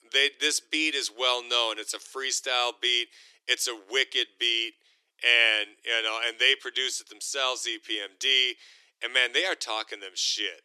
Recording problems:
thin; very; fading below 300 Hz

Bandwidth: 13.5 kHz